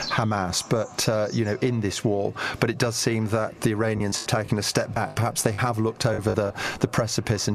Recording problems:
echo of what is said; faint; throughout; 410 ms later, 25 dB below the speech
squashed, flat; somewhat, background pumping
animal sounds; noticeable; throughout; 15 dB below the speech
choppy; very; from 4 to 6.5 s; 11% of the speech affected
abrupt cut into speech; at the end

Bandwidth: 14 kHz